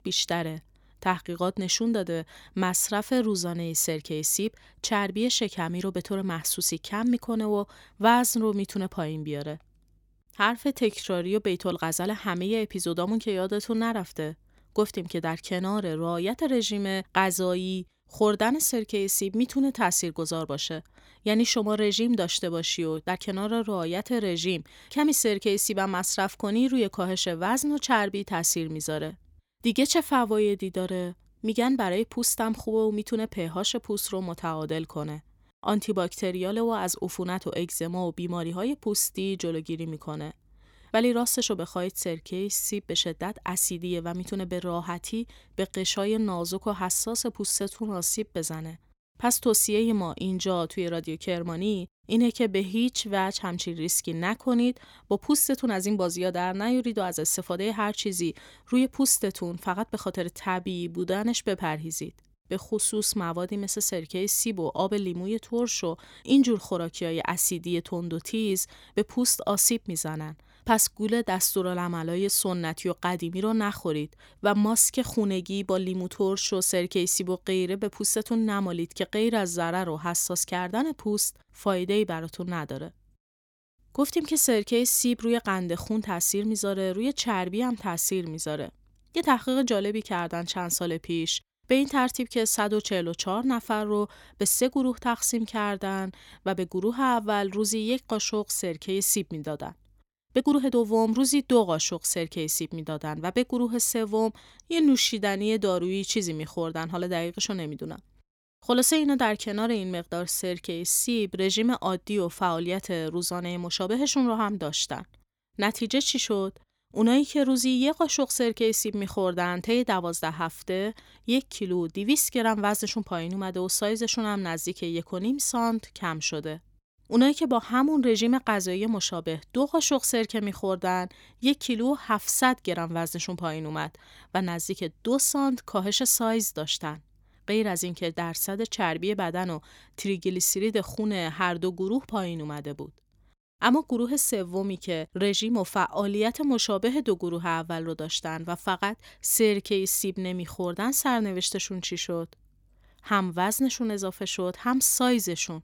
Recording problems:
uneven, jittery; strongly; from 11 s to 2:26

